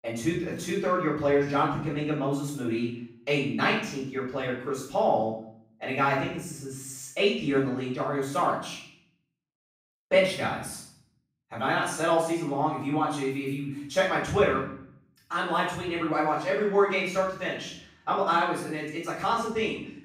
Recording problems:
off-mic speech; far
room echo; noticeable; dies away in 0.6 s

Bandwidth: 15.5 kHz